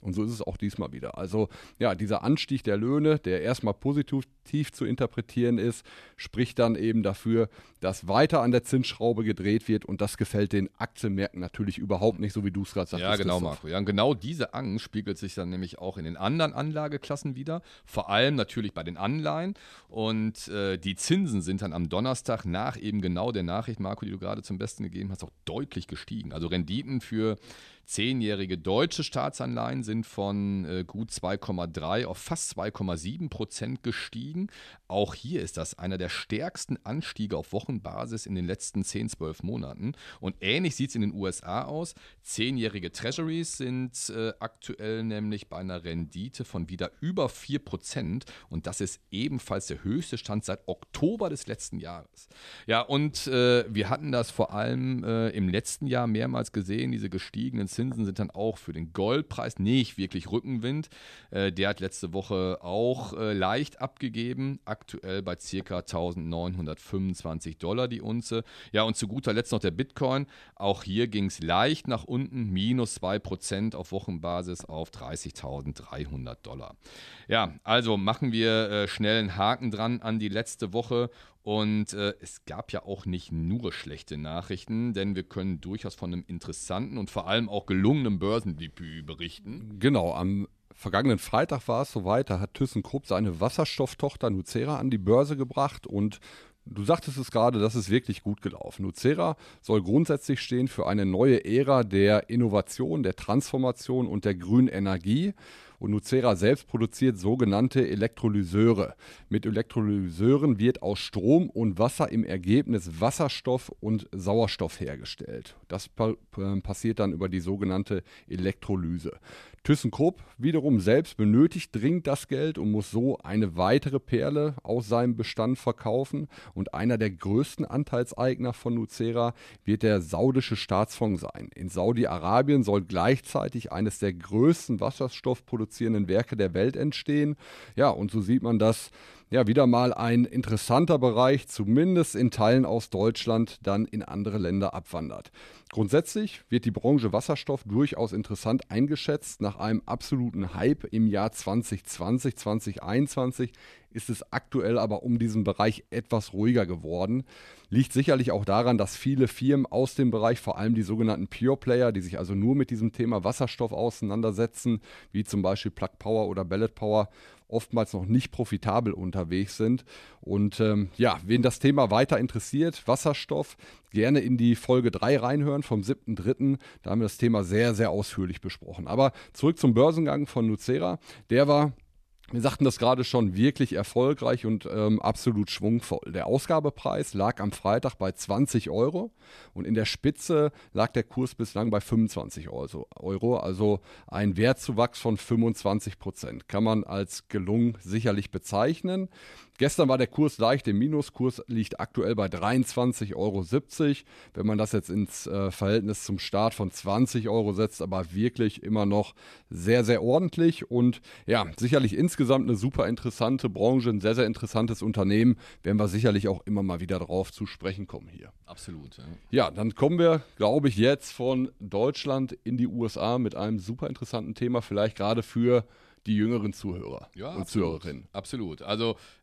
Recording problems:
none

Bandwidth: 13.5 kHz